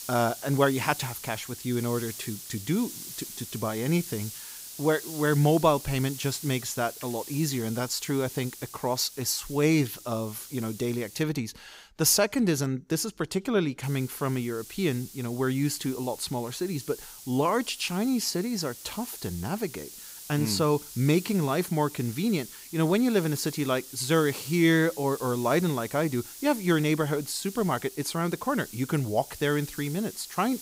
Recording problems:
hiss; noticeable; until 11 s and from 14 s on; 15 dB below the speech

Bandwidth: 15.5 kHz